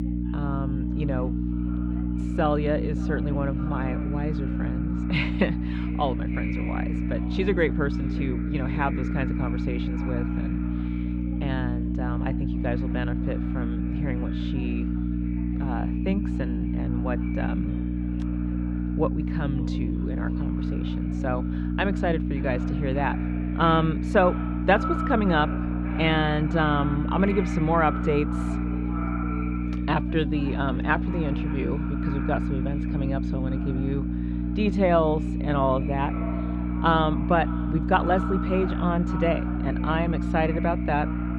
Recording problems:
echo of what is said; noticeable; throughout; 570 ms later, 15 dB below the speech
muffled; slightly; fading above 3.5 kHz
electrical hum; loud; throughout; 60 Hz, 8 dB below the speech
chatter from many people; faint; throughout; 25 dB below the speech

